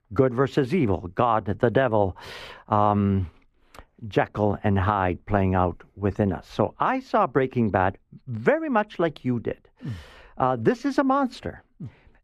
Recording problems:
muffled; slightly; fading above 3 kHz

